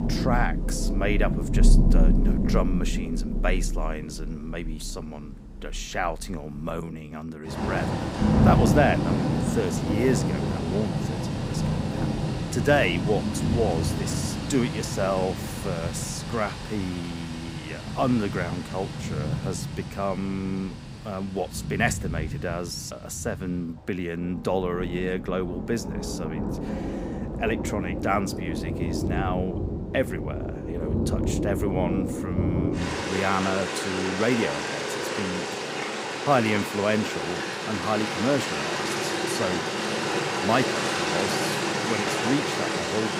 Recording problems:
rain or running water; very loud; throughout; 1 dB above the speech

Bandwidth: 15.5 kHz